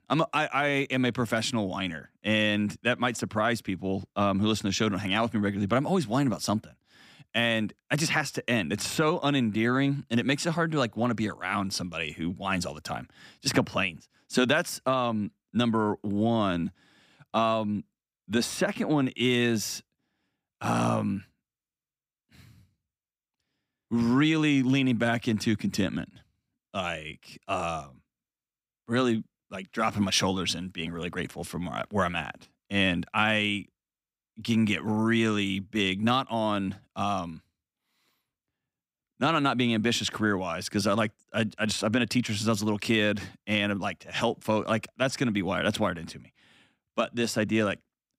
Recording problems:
none

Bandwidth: 15.5 kHz